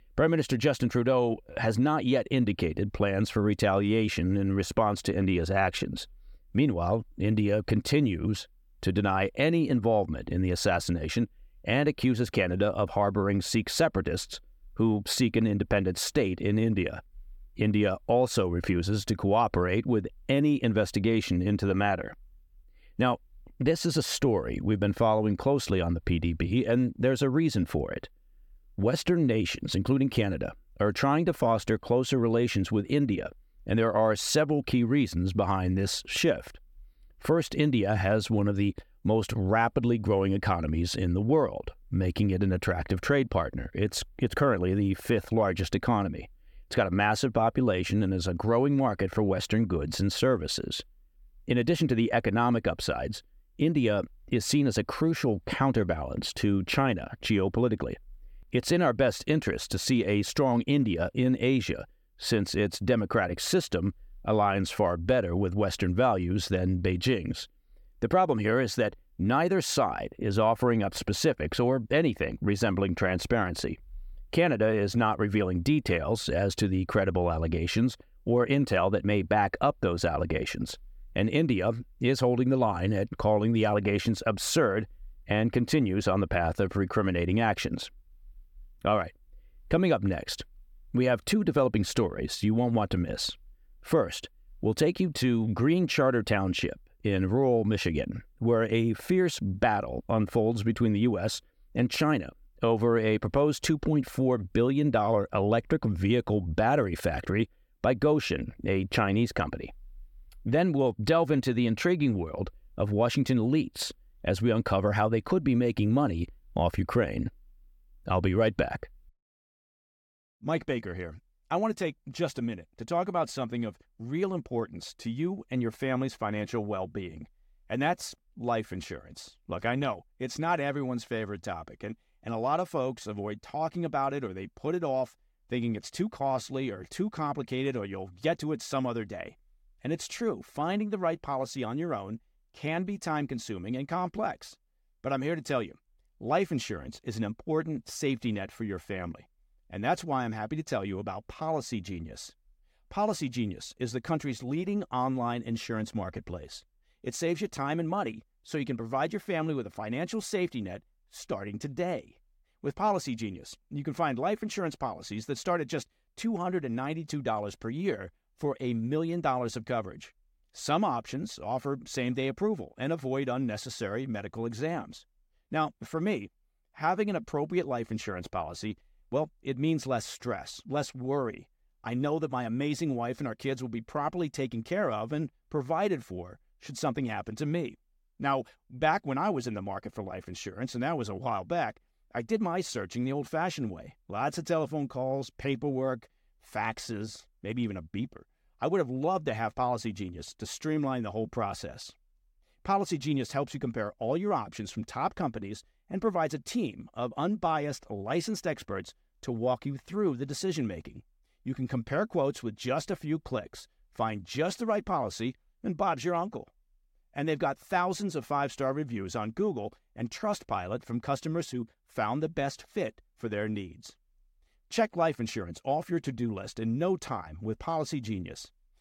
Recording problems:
none

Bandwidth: 17.5 kHz